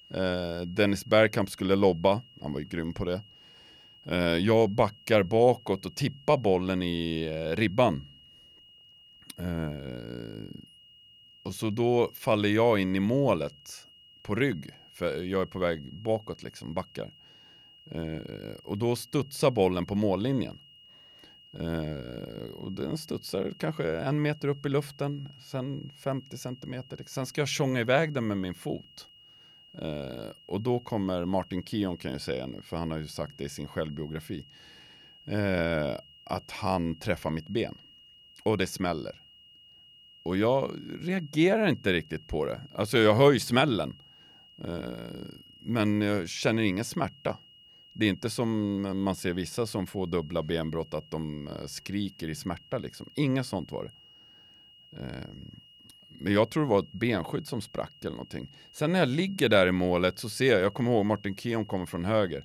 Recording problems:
high-pitched whine; faint; throughout; 3 kHz, 25 dB below the speech

